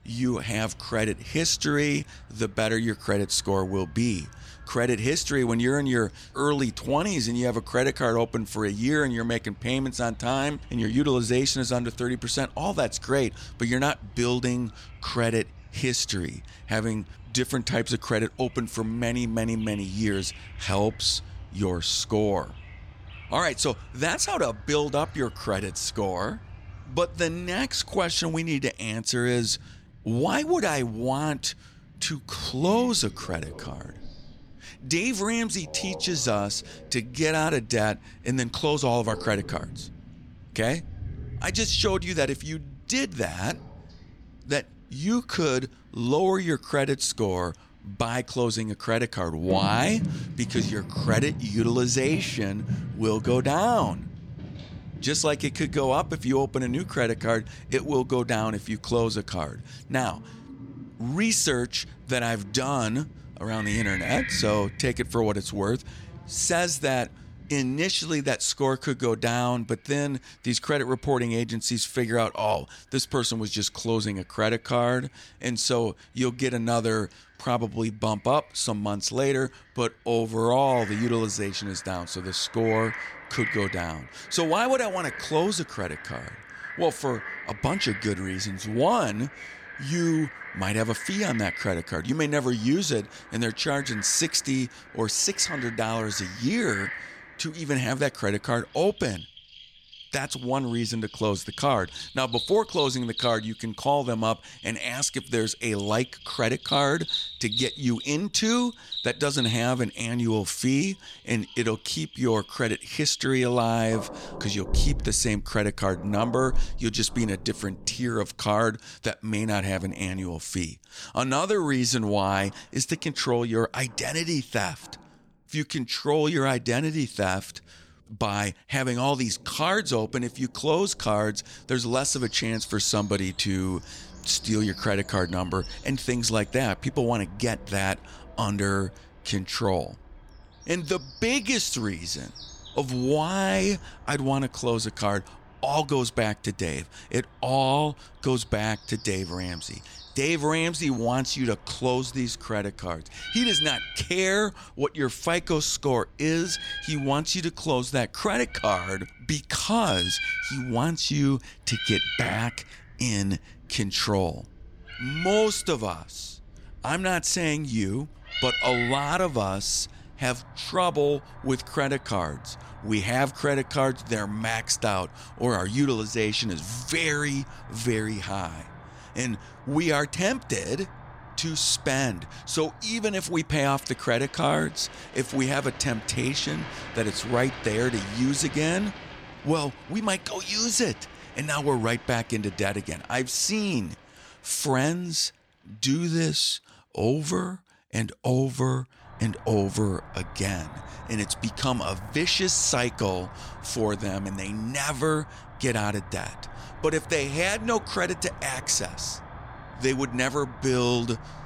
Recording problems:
animal sounds; noticeable; throughout; 10 dB below the speech

